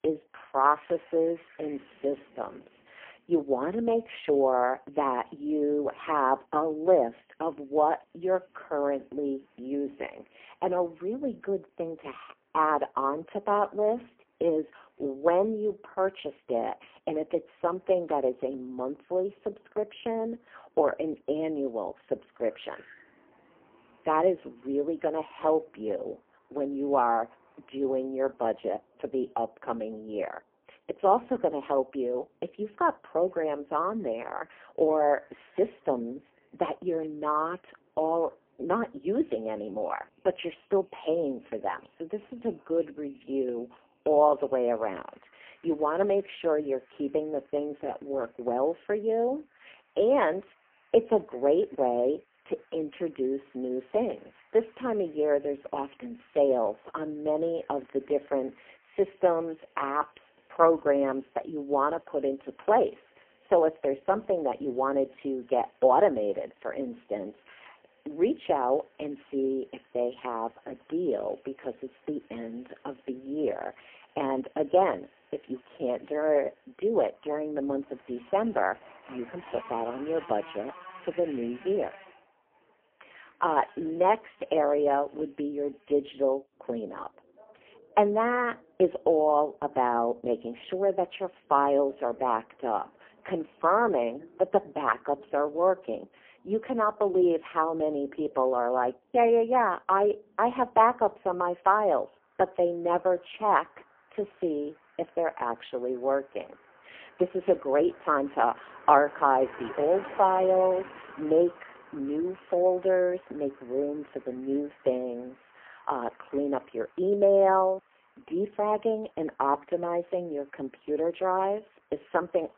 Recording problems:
phone-call audio; poor line; nothing above 3 kHz
traffic noise; faint; throughout; 25 dB below the speech

